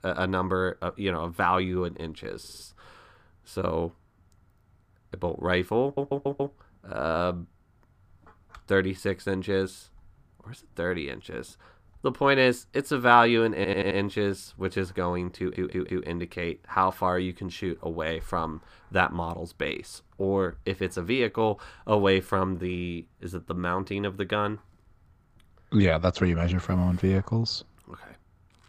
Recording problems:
audio stuttering; 4 times, first at 2.5 s

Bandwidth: 15 kHz